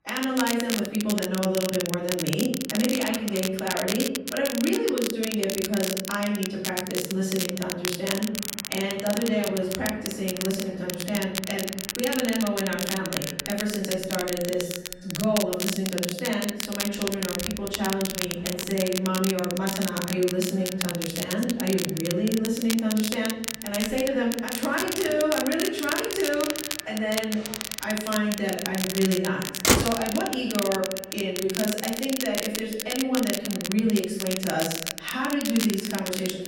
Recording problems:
off-mic speech; far
room echo; noticeable; dies away in 0.7 s
echo of what is said; faint; from 9.5 s on; 280 ms later, 20 dB below the speech
traffic noise; loud; throughout; 6 dB below the speech
crackle, like an old record; loud; 4 dB below the speech

